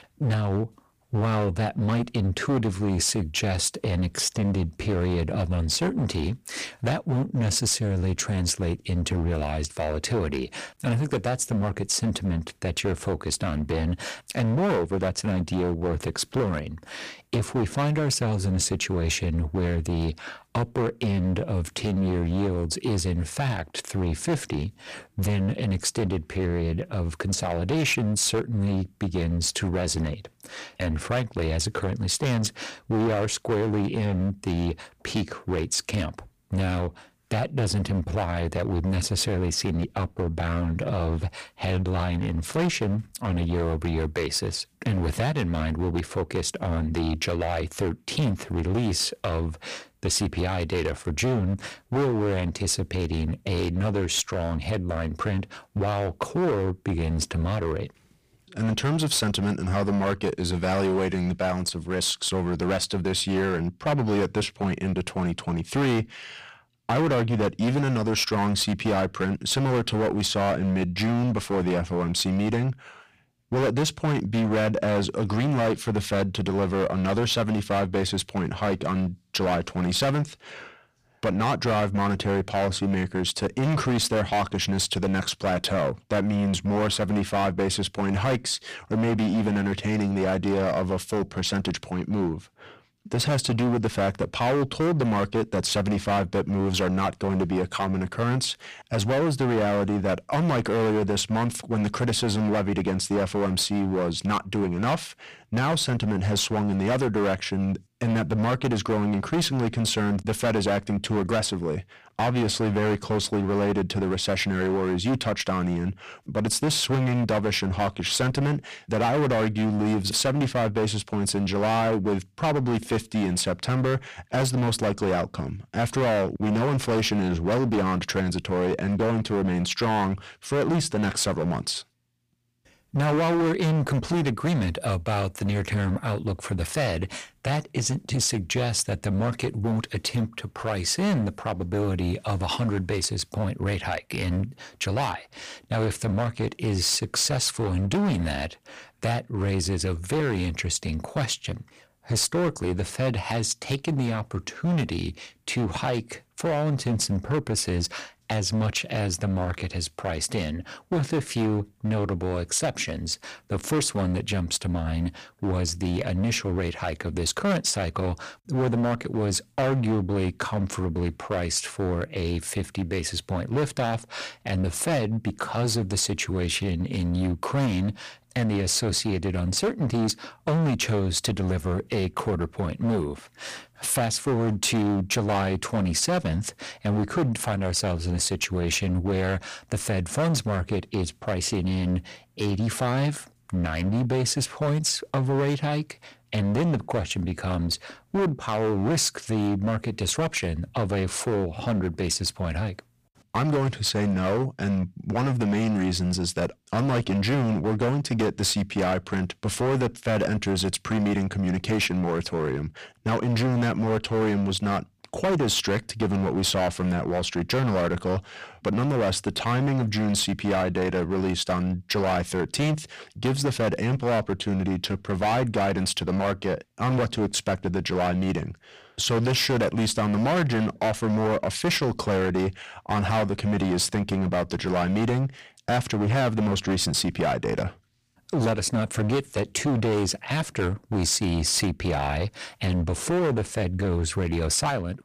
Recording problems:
distortion; heavy; 17% of the sound clipped

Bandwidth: 15 kHz